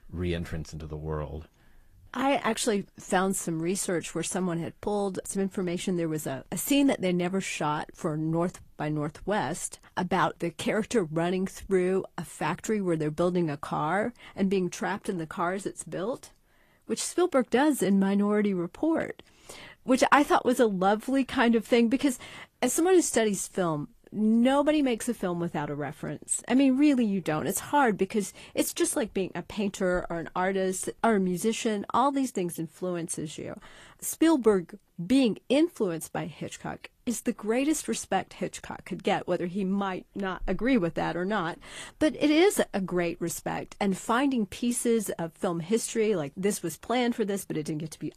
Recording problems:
garbled, watery; slightly; nothing above 14.5 kHz

